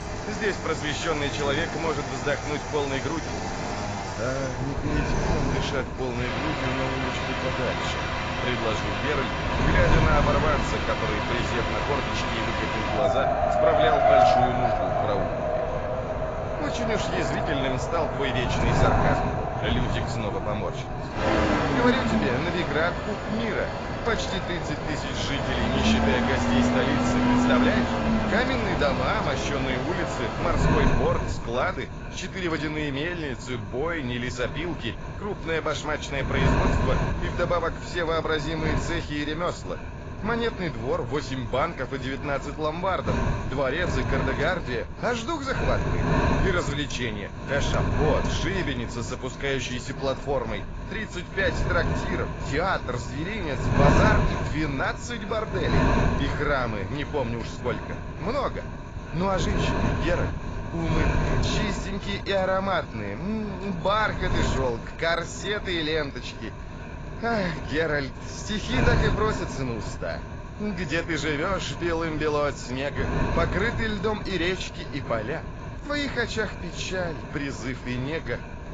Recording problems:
garbled, watery; badly; nothing above 7.5 kHz
traffic noise; very loud; until 31 s; 2 dB above the speech
wind noise on the microphone; heavy; 6 dB below the speech

